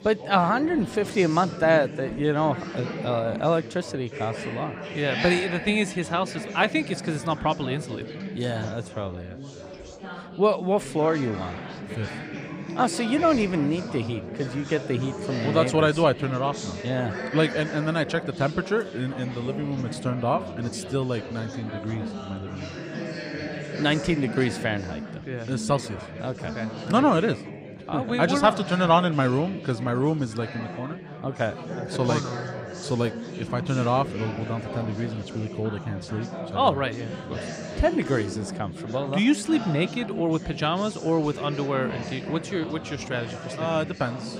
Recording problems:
chatter from many people; loud; throughout; 9 dB below the speech

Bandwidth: 15 kHz